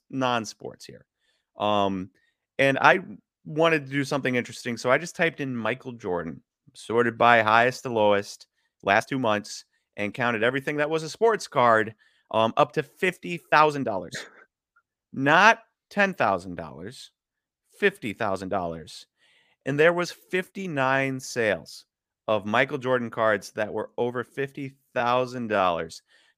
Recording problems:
uneven, jittery; strongly; from 2.5 to 26 s

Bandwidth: 15 kHz